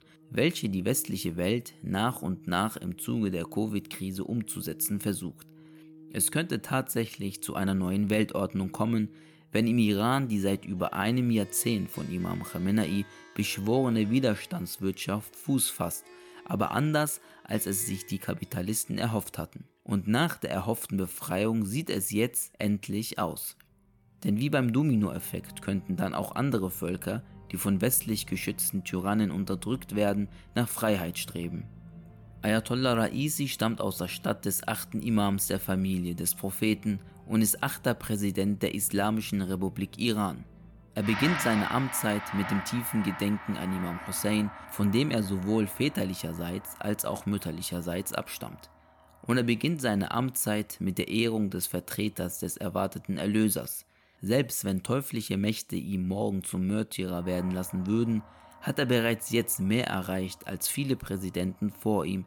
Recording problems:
background music; noticeable; throughout; 15 dB below the speech

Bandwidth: 17.5 kHz